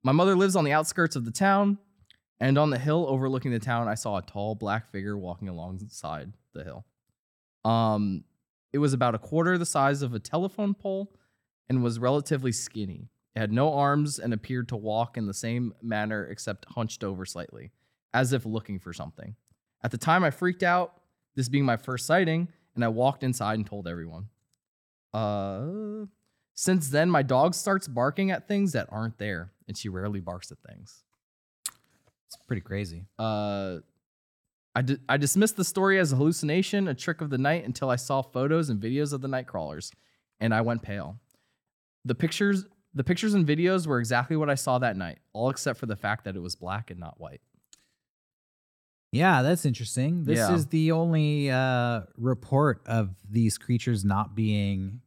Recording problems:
none

